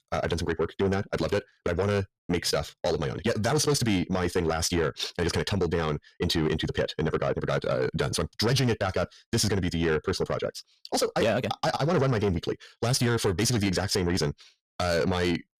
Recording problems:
wrong speed, natural pitch; too fast; 1.7 times normal speed
distortion; slight; 10 dB below the speech

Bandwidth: 14.5 kHz